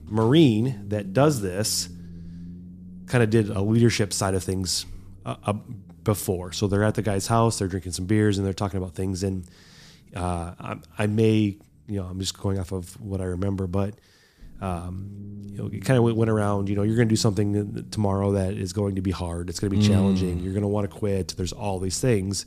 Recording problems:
low rumble; faint; throughout; 25 dB below the speech

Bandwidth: 14.5 kHz